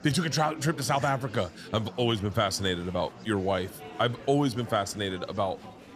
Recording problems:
murmuring crowd; noticeable; throughout; 15 dB below the speech

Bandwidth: 14.5 kHz